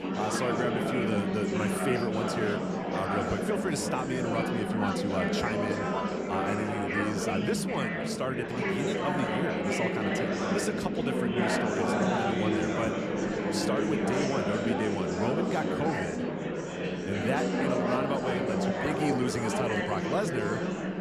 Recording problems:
chatter from many people; very loud; throughout; 3 dB above the speech

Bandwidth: 14.5 kHz